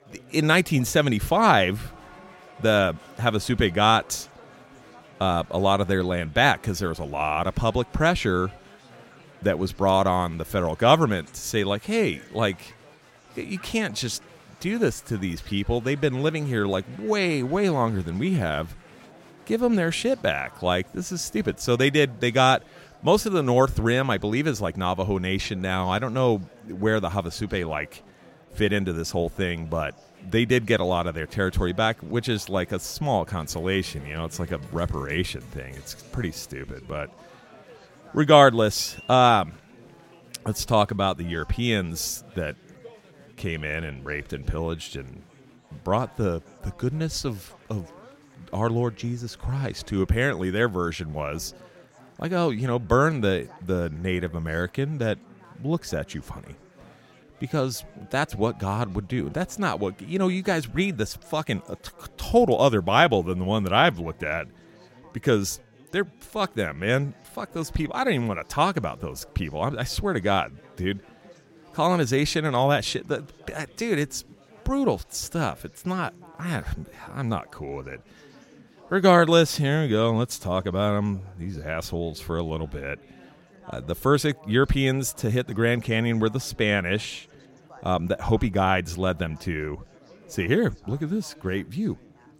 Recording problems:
chatter from many people; faint; throughout; 25 dB below the speech

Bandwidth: 16 kHz